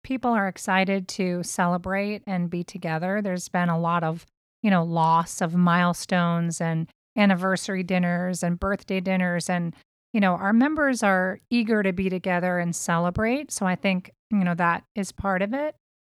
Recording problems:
none

